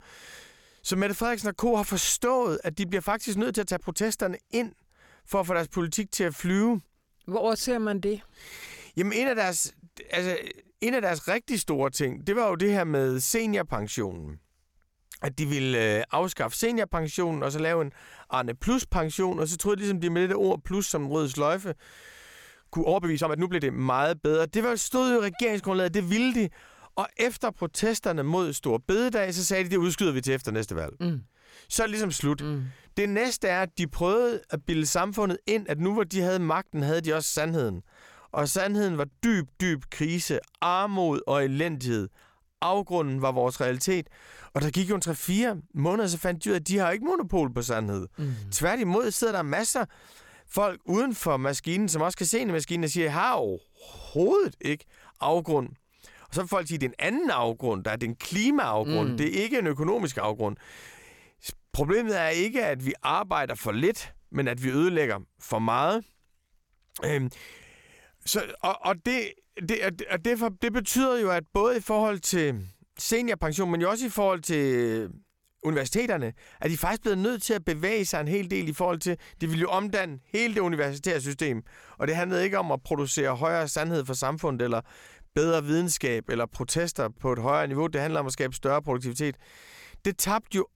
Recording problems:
uneven, jittery; strongly; from 3.5 s to 1:27

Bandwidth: 17 kHz